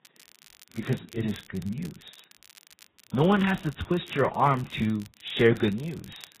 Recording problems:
garbled, watery; badly; nothing above 4 kHz
crackle, like an old record; faint; 25 dB below the speech

